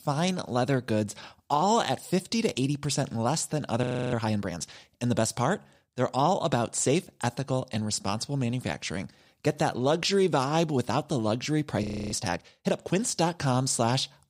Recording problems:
audio freezing; at 4 s and at 12 s

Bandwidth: 15.5 kHz